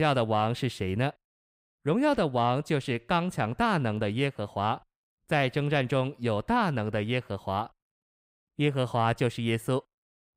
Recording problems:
abrupt cut into speech; at the start

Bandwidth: 15.5 kHz